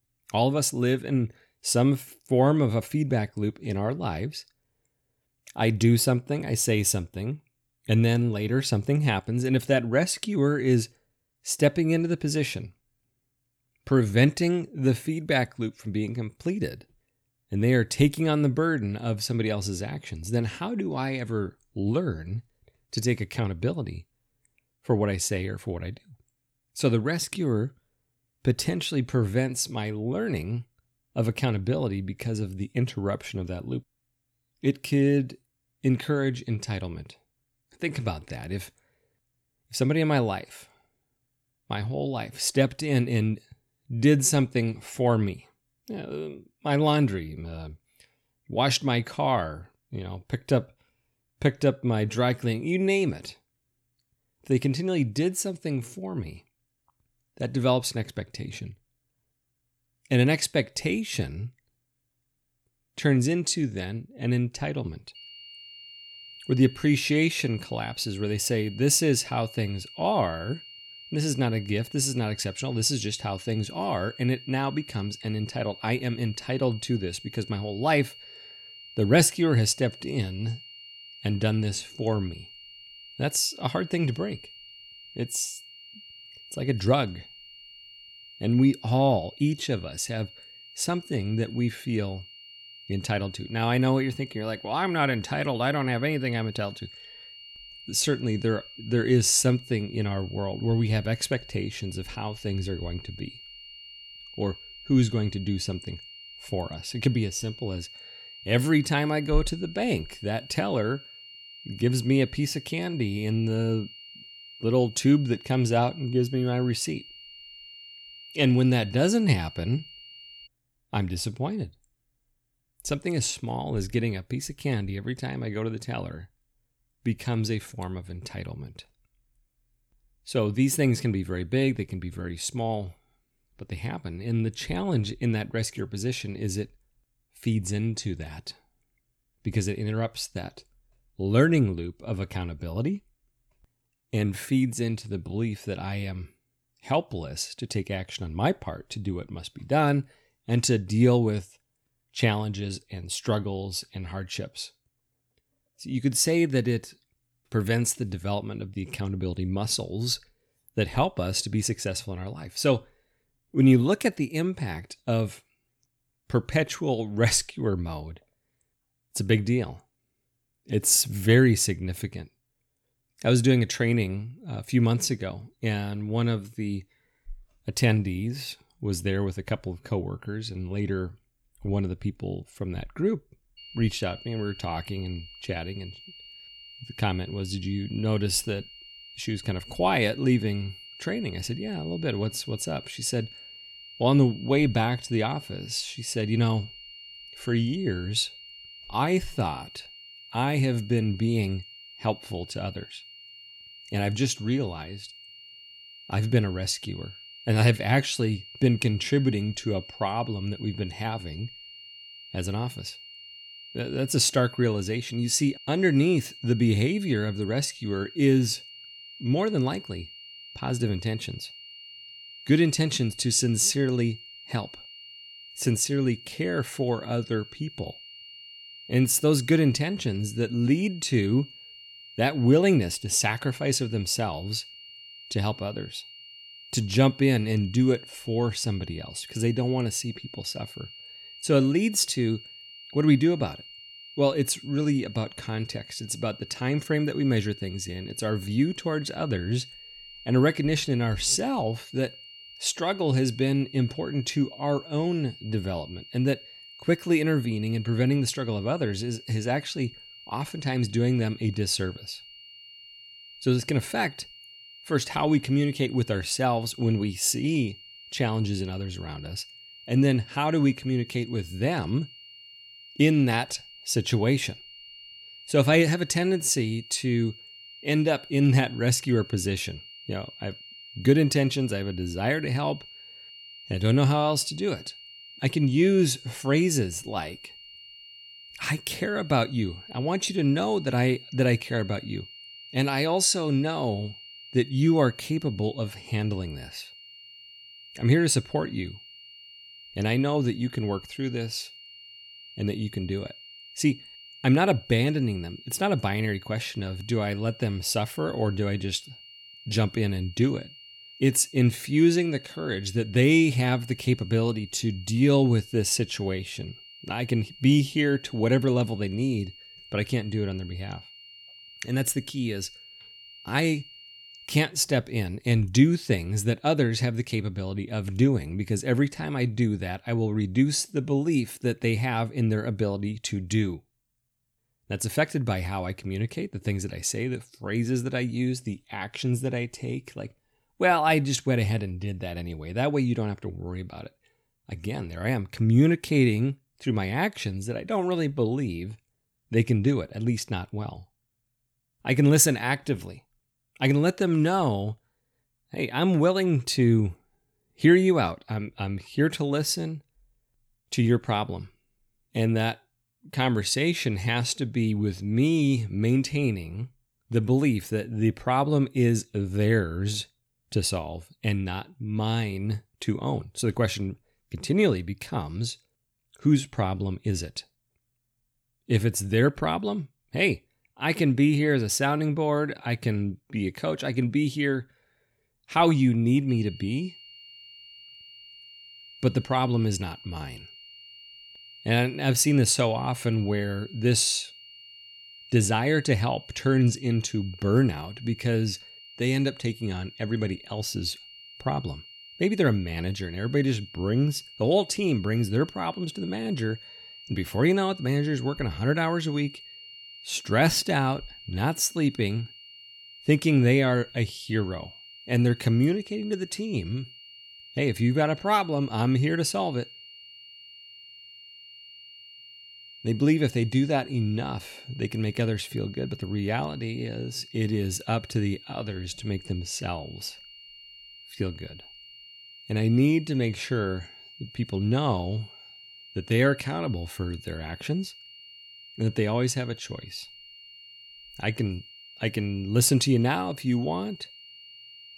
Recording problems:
high-pitched whine; noticeable; from 1:05 to 2:00, from 3:04 to 5:24 and from 6:26 on; 3 kHz, 20 dB below the speech

